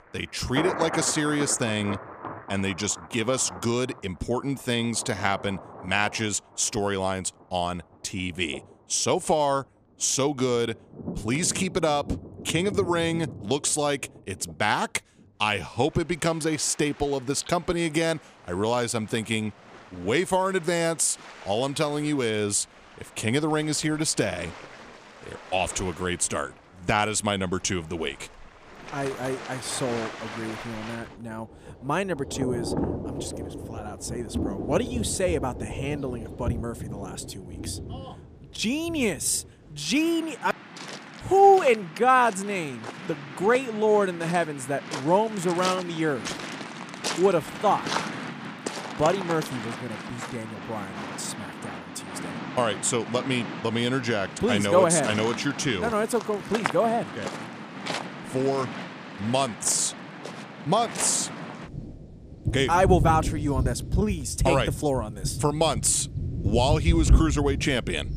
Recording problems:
rain or running water; loud; throughout; 8 dB below the speech

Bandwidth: 14.5 kHz